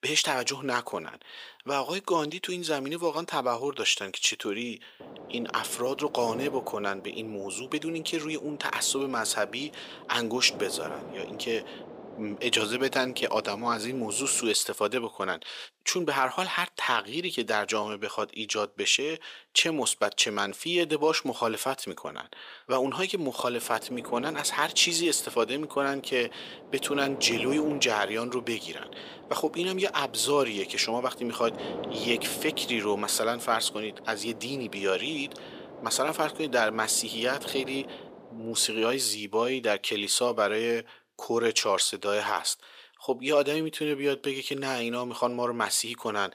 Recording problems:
thin; somewhat; fading below 500 Hz
wind noise on the microphone; occasional gusts; from 5 to 14 s and from 24 to 39 s; 15 dB below the speech

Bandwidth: 15 kHz